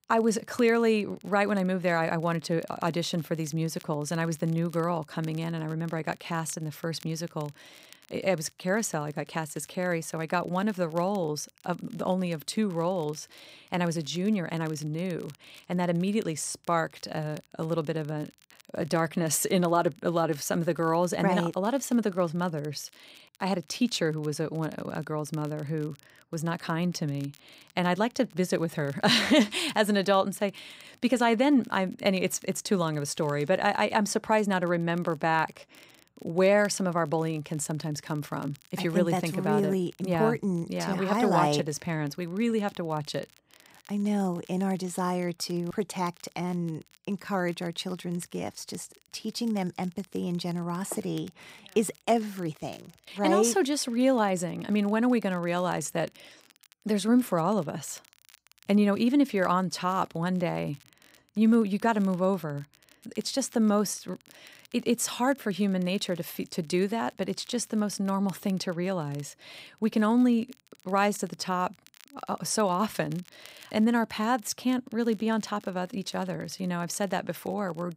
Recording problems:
crackle, like an old record; faint; 30 dB below the speech

